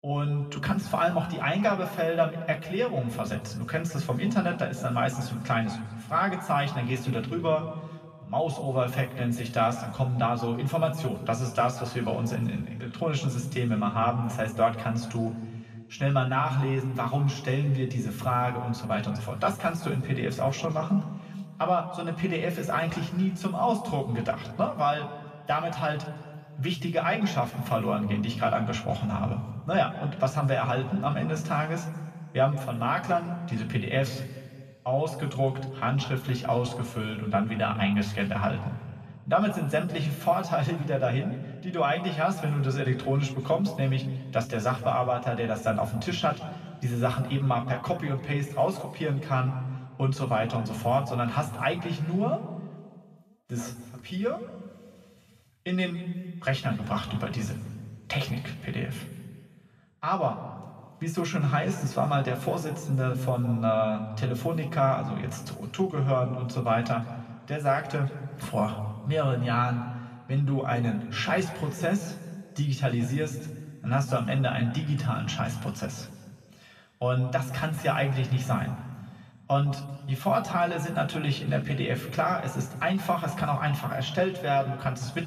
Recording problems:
off-mic speech; far
room echo; noticeable; dies away in 1.5 s

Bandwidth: 14.5 kHz